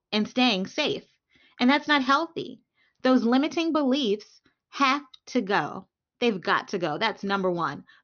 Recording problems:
high frequencies cut off; noticeable; nothing above 6.5 kHz

